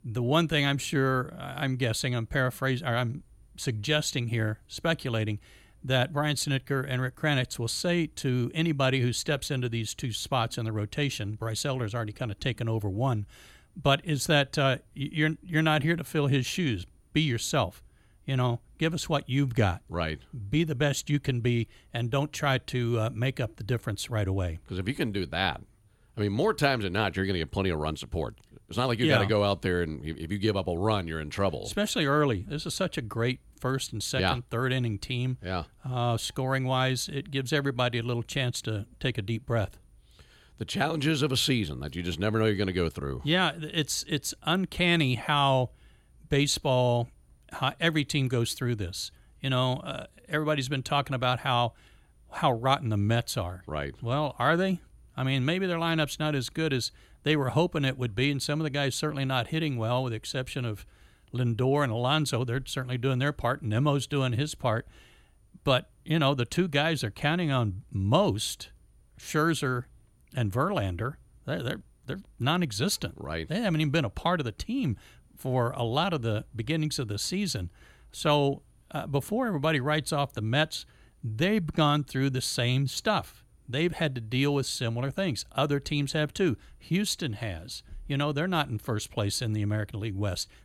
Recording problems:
none

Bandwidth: 18 kHz